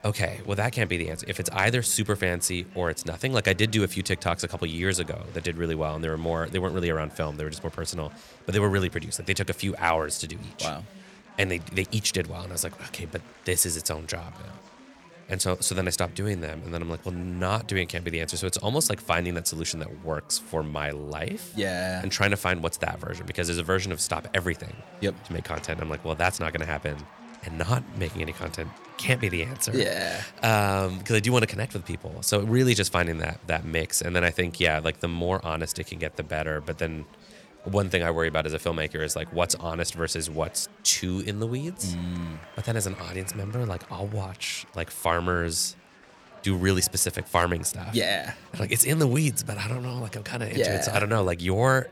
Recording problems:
chatter from many people; faint; throughout; 20 dB below the speech

